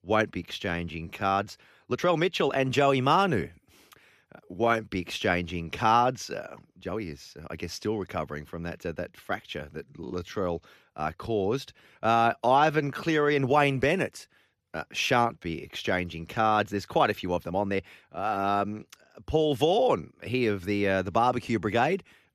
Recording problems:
uneven, jittery; strongly; from 0.5 to 21 s

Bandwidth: 14.5 kHz